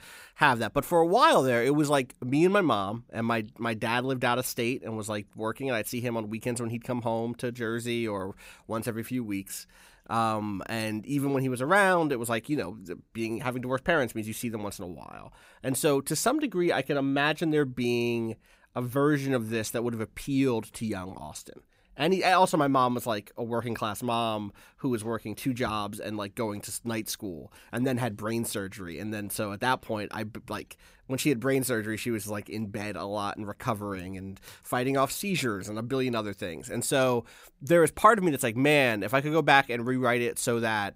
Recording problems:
none

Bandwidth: 15.5 kHz